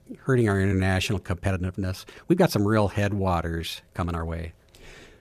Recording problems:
uneven, jittery; strongly; from 0.5 to 4 s

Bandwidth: 14.5 kHz